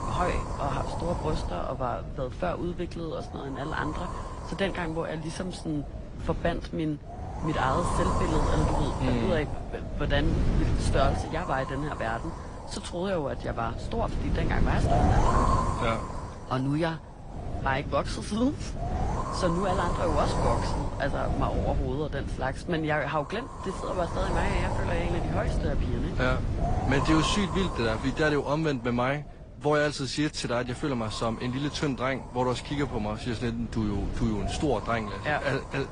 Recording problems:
garbled, watery; slightly; nothing above 10 kHz
wind noise on the microphone; heavy; 4 dB below the speech

